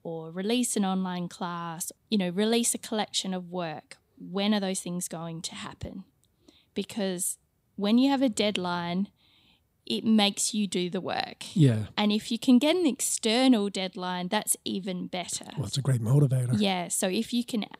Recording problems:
none

